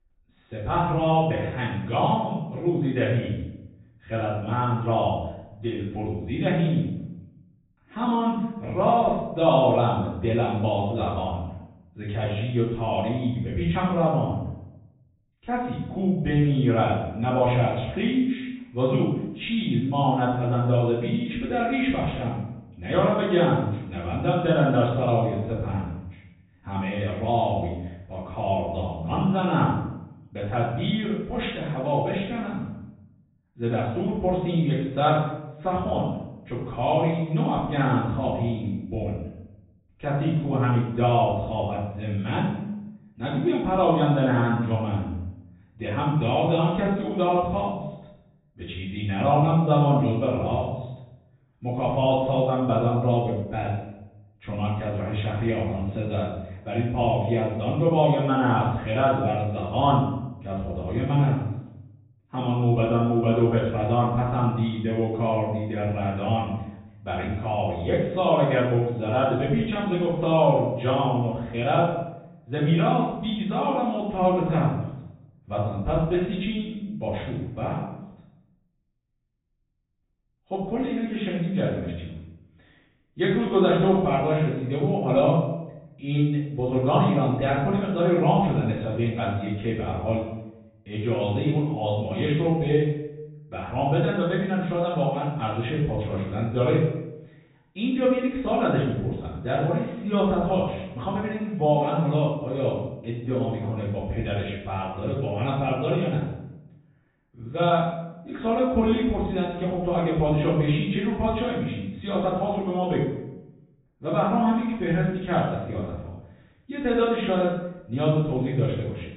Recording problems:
off-mic speech; far
high frequencies cut off; severe; nothing above 4 kHz
room echo; noticeable; dies away in 0.7 s

